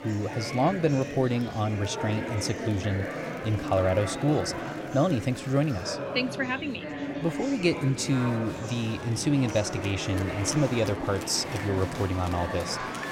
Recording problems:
murmuring crowd; loud; throughout; 6 dB below the speech

